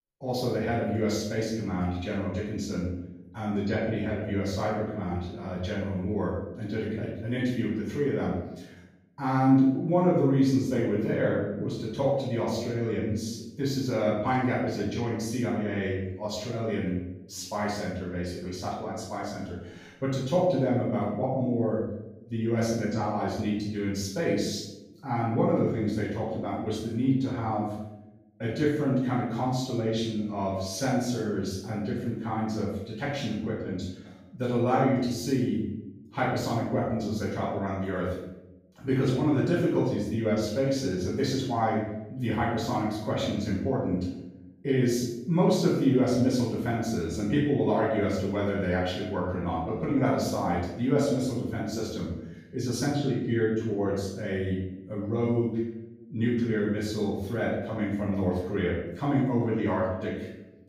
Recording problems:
off-mic speech; far
room echo; noticeable; dies away in 0.8 s

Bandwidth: 15.5 kHz